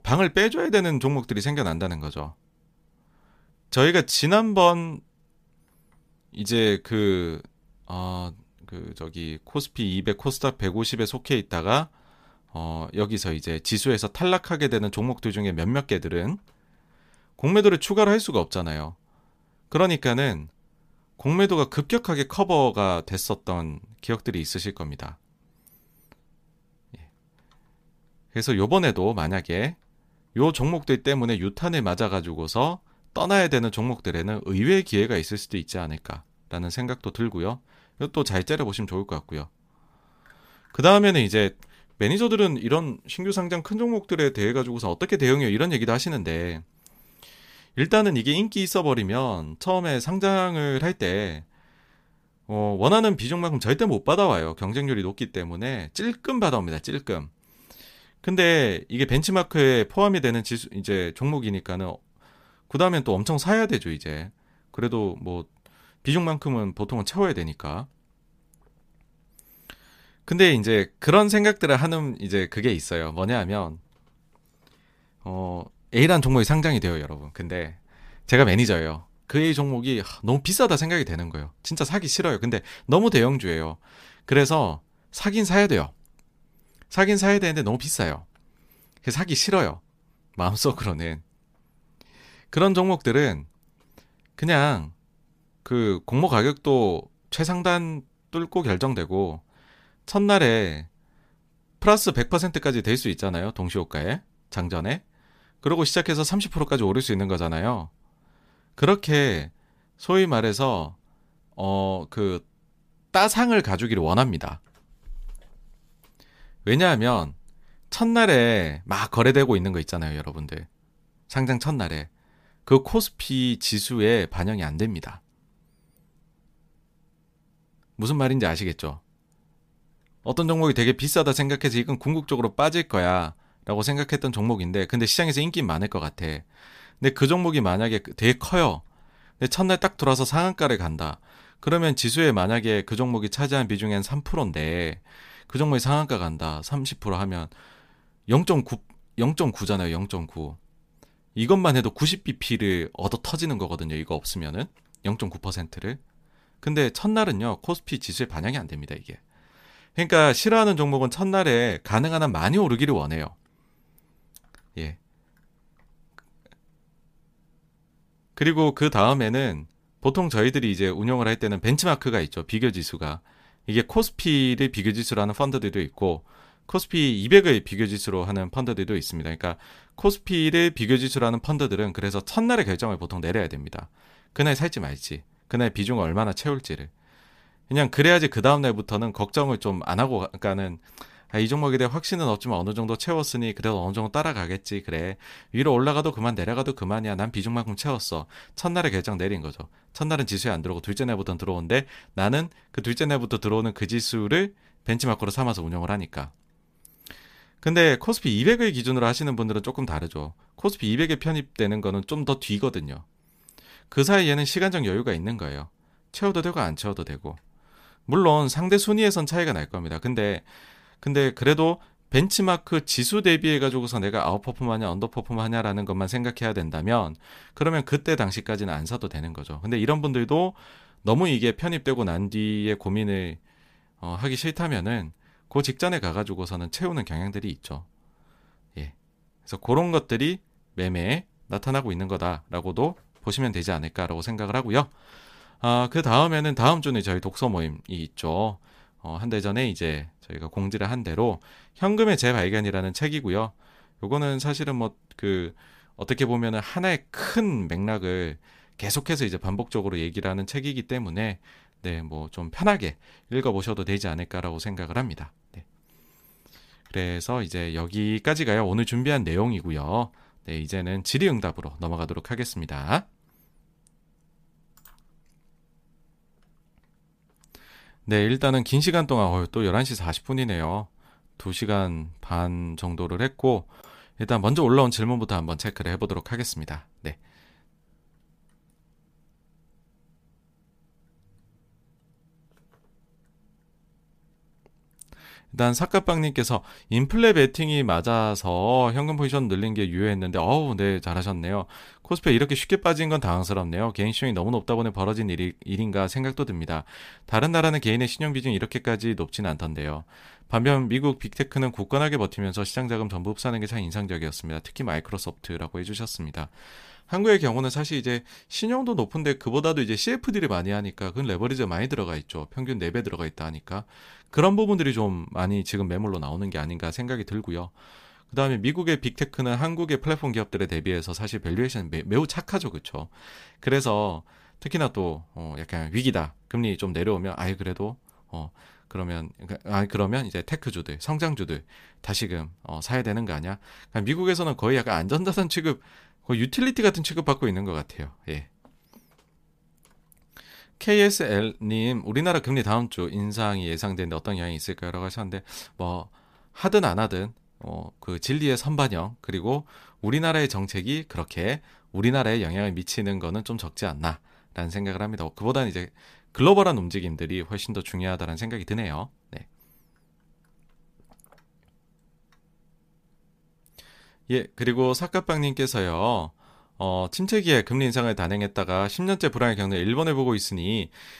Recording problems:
none

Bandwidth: 15 kHz